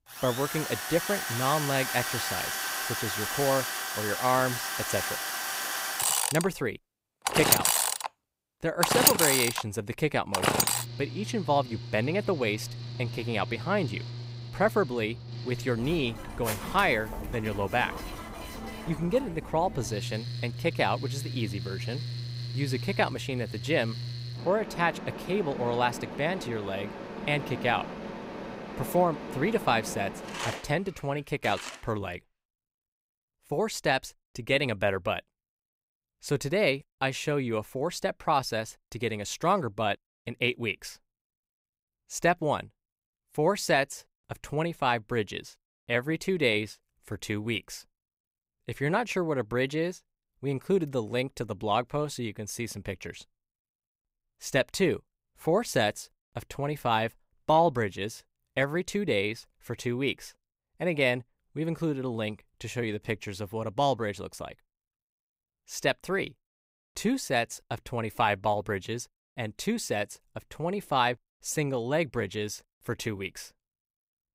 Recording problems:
machinery noise; loud; until 32 s; 2 dB below the speech

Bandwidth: 15.5 kHz